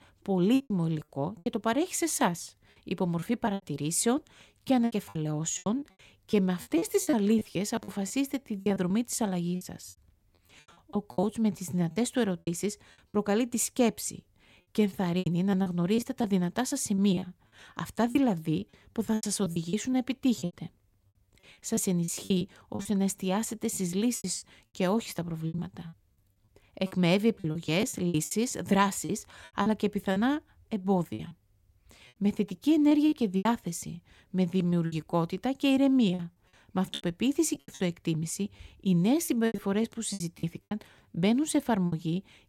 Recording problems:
choppy; very; 12% of the speech affected

